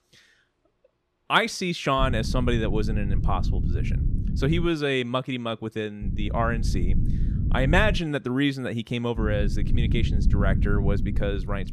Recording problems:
low rumble; noticeable; from 2 to 4.5 s, from 6 to 8 s and from 9 s on; 15 dB below the speech

